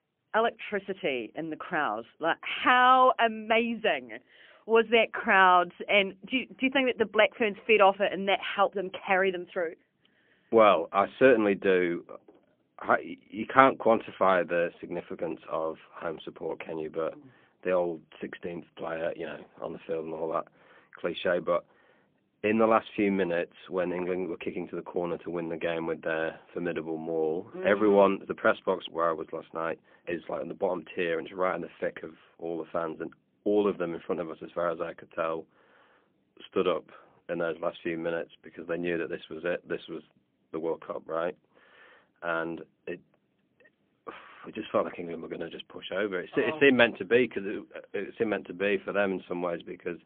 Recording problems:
phone-call audio; poor line; nothing above 3.5 kHz

